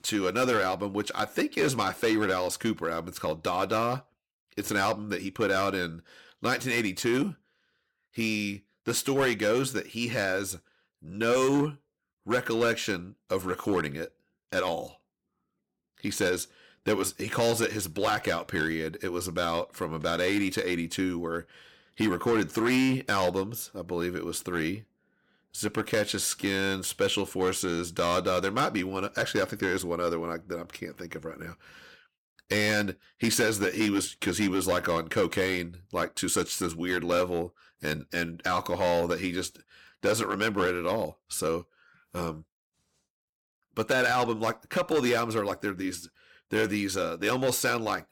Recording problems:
distortion; slight; 4% of the sound clipped

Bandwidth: 17.5 kHz